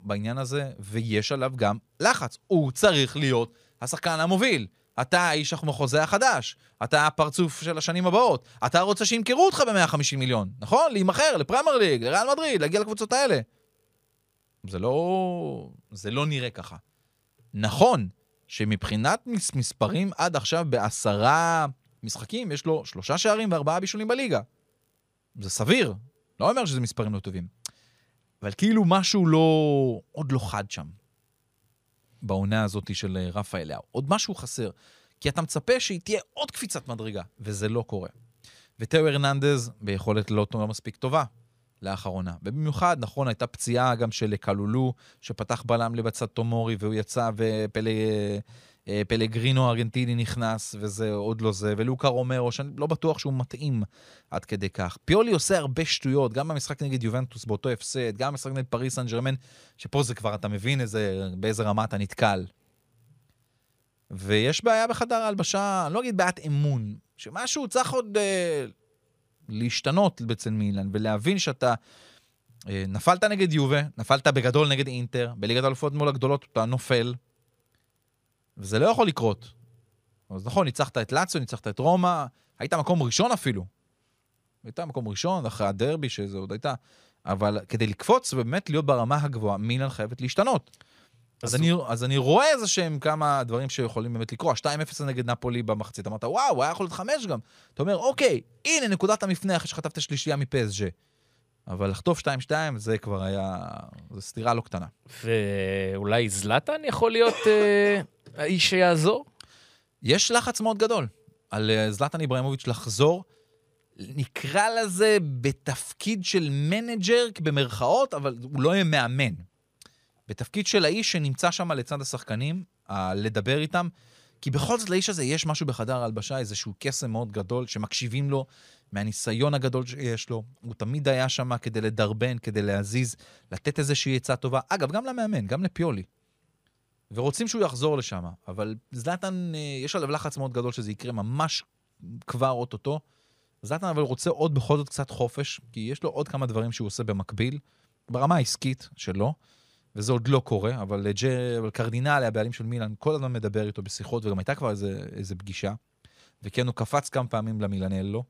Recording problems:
none

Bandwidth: 15 kHz